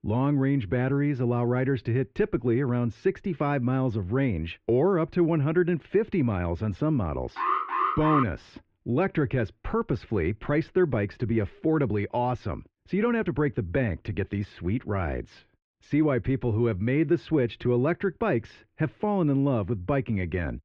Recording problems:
muffled; very; fading above 2.5 kHz
alarm; loud; at 7.5 s; peak 1 dB above the speech

